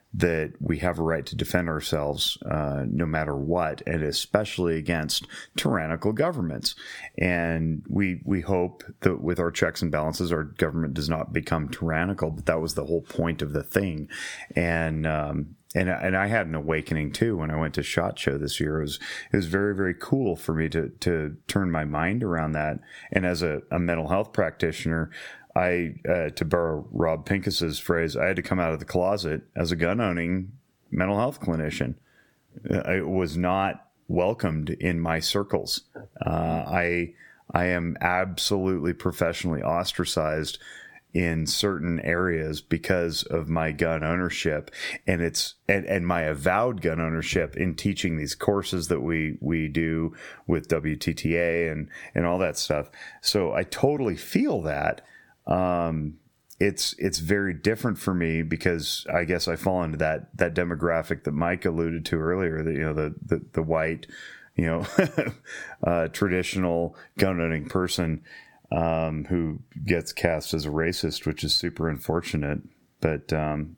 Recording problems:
squashed, flat; somewhat

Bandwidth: 18 kHz